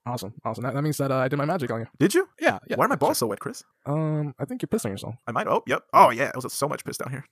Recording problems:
wrong speed, natural pitch; too fast; 1.7 times normal speed

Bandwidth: 14.5 kHz